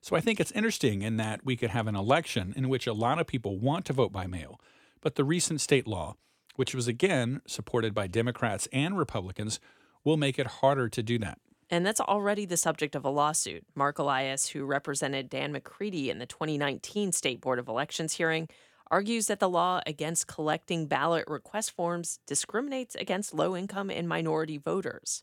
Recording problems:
none

